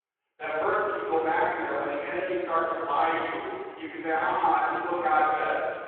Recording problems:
room echo; strong; dies away in 1.8 s
off-mic speech; far
phone-call audio
voice in the background; noticeable; throughout; 20 dB below the speech

